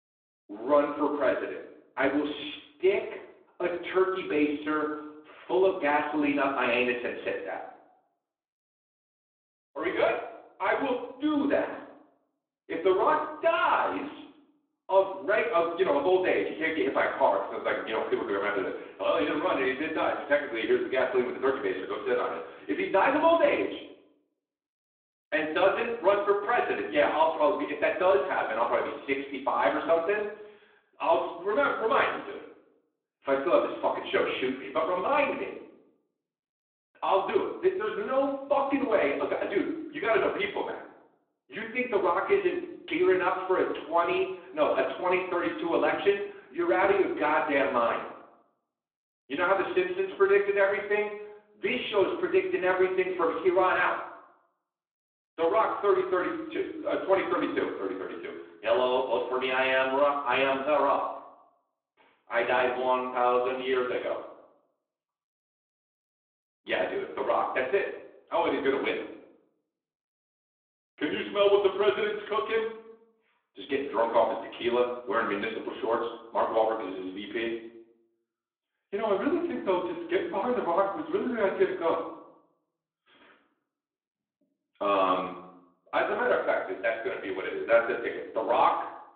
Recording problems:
off-mic speech; far
room echo; slight; dies away in 0.7 s
phone-call audio

